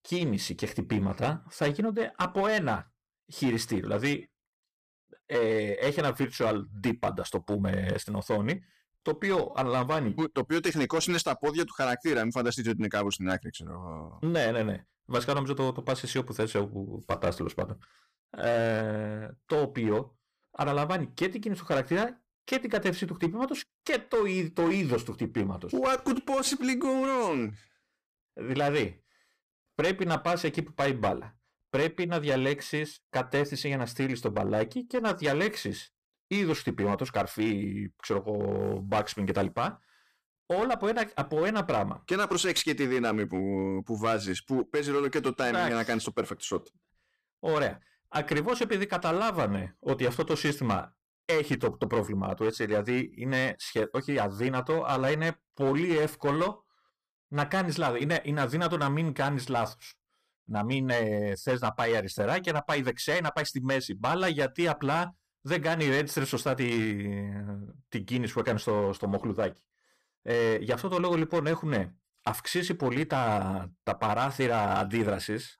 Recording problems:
distortion; slight; 6% of the sound clipped

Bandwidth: 14.5 kHz